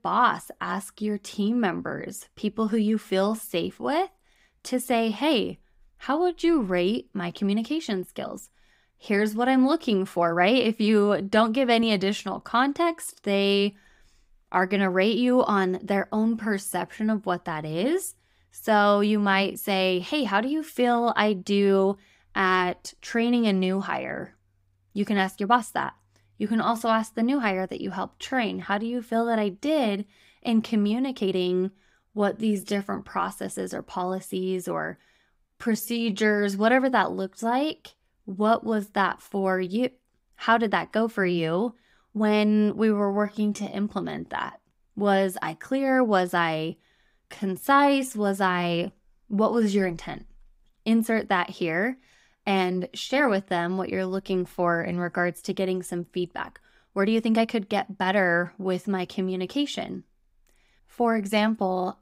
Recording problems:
uneven, jittery; strongly; from 7.5 to 58 s

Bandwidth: 15.5 kHz